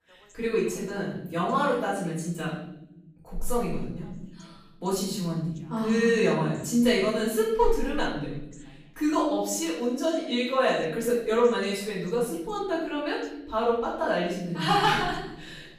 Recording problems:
off-mic speech; far
room echo; noticeable; dies away in 1 s
voice in the background; faint; throughout; 30 dB below the speech

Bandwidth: 15 kHz